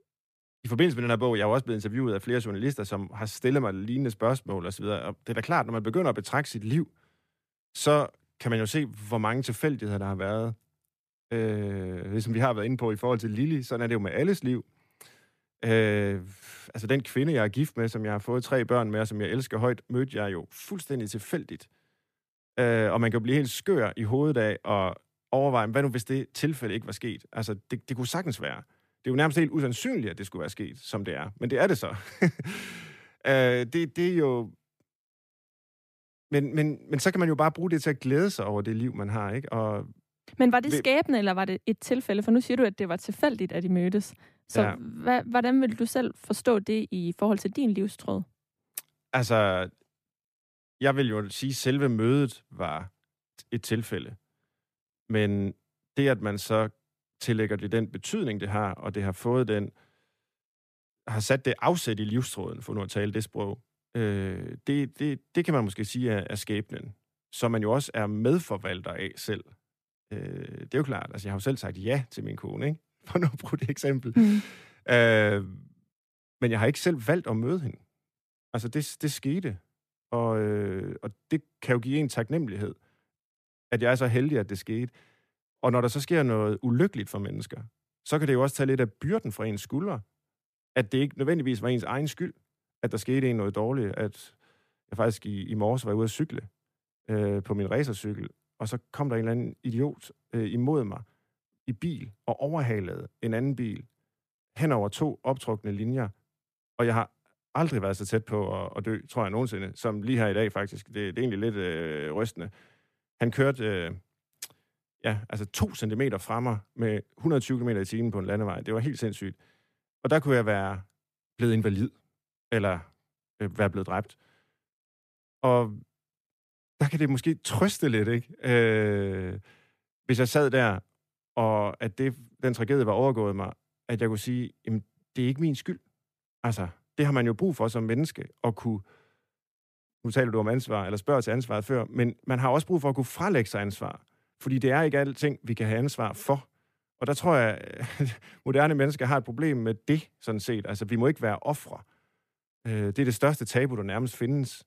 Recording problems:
none

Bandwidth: 14.5 kHz